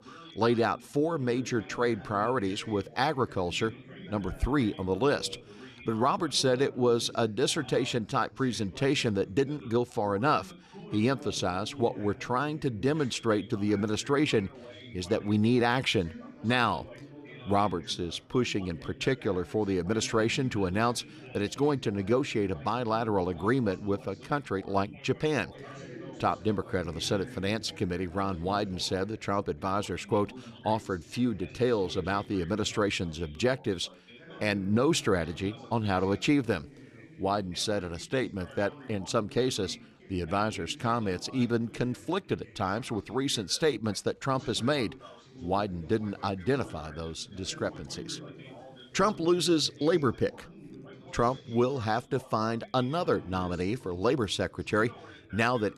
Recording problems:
background chatter; noticeable; throughout; 2 voices, 20 dB below the speech

